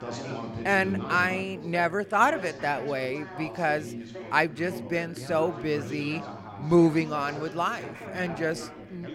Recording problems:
background chatter; noticeable; throughout; 3 voices, 10 dB below the speech

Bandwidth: 16 kHz